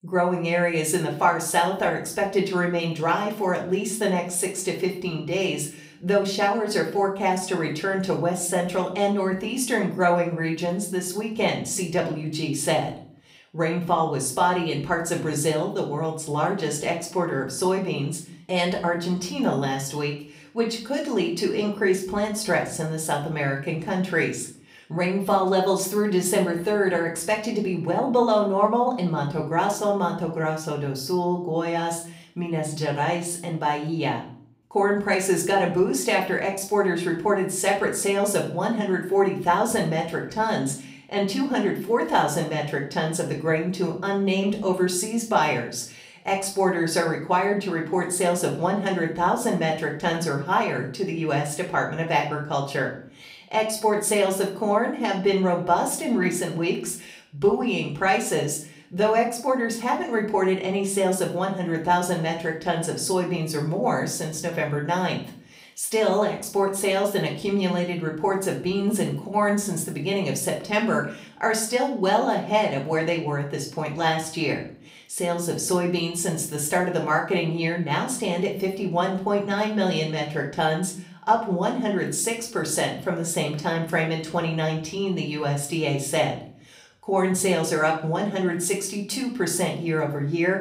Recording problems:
room echo; slight; dies away in 0.4 s
off-mic speech; somewhat distant

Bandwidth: 15.5 kHz